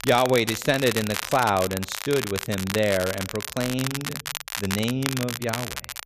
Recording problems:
crackle, like an old record; loud; 6 dB below the speech

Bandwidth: 14.5 kHz